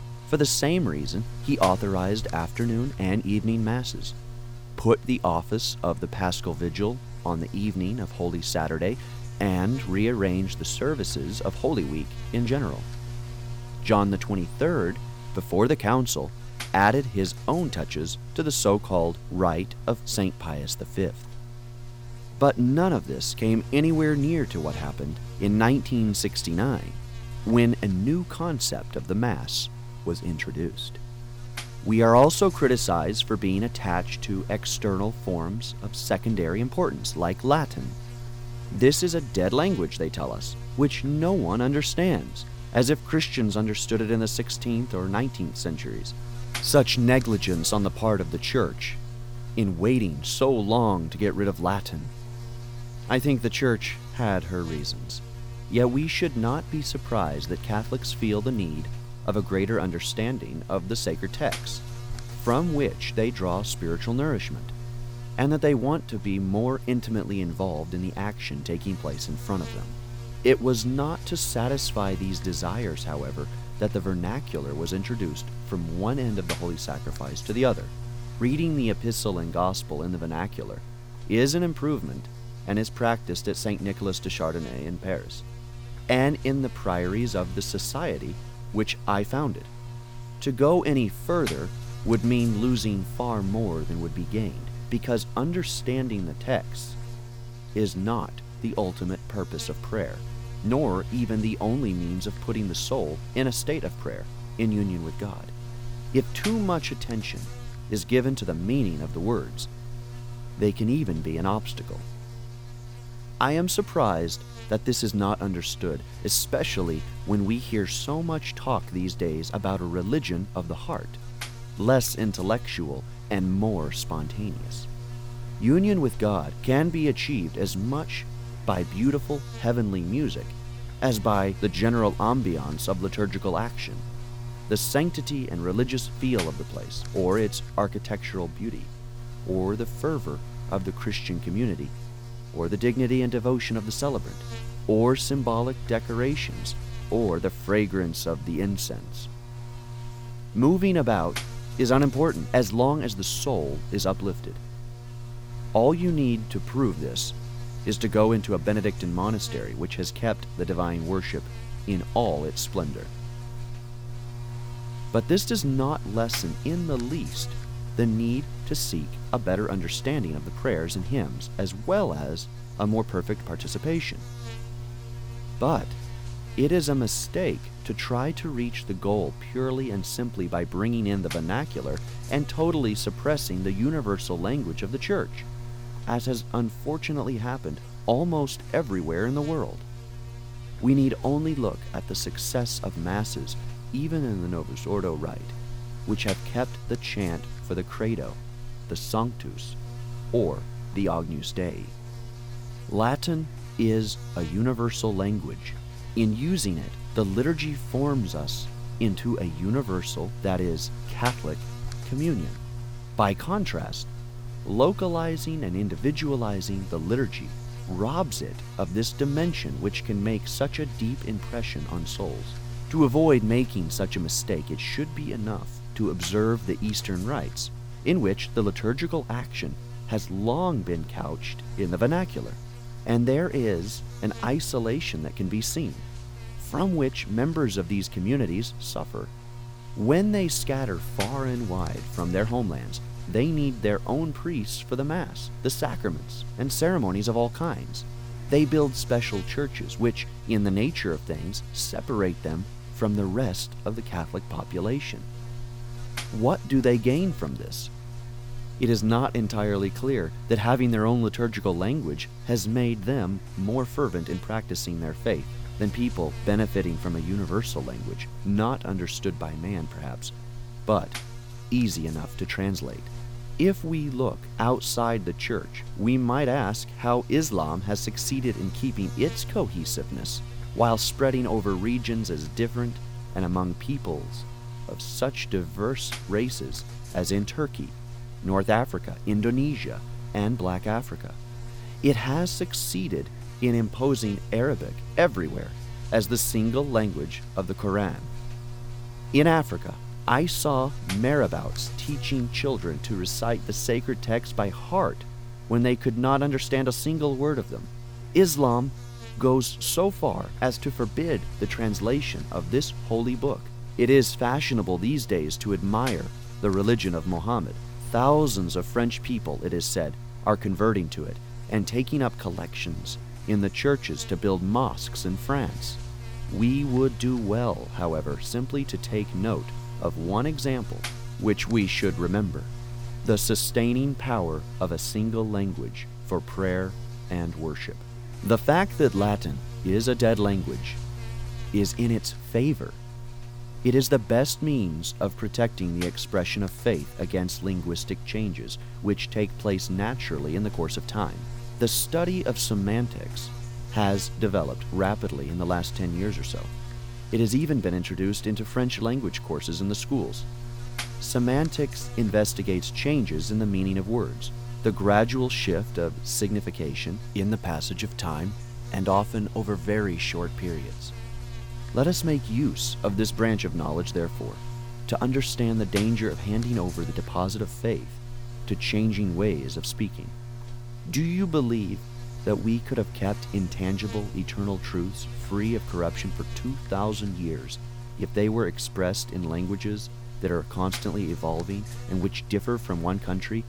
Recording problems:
electrical hum; noticeable; throughout; 60 Hz, 15 dB below the speech

